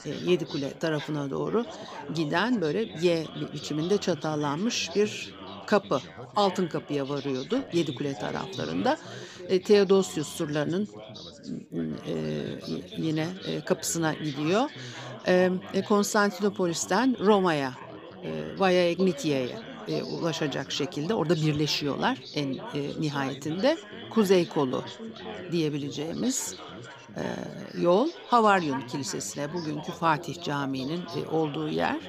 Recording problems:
background chatter; noticeable; throughout; 4 voices, 15 dB below the speech

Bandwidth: 15 kHz